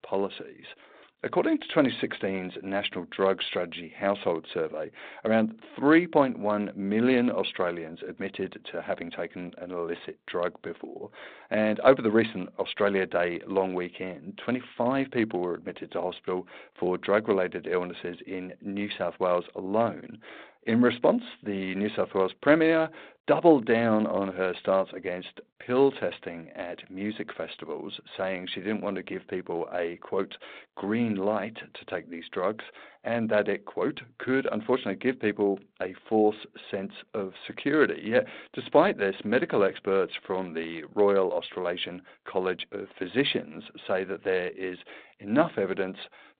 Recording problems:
phone-call audio; nothing above 4 kHz

